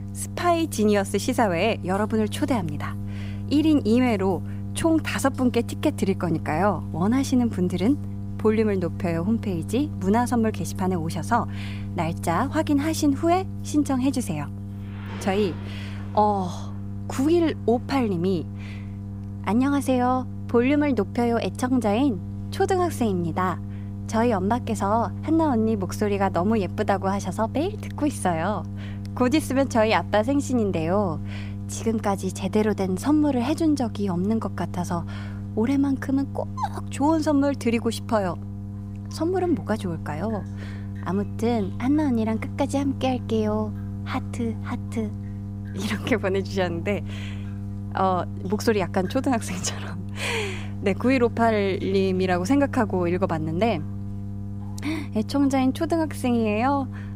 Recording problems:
electrical hum; noticeable; throughout; 50 Hz, 20 dB below the speech
rain or running water; faint; throughout; 30 dB below the speech

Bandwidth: 15.5 kHz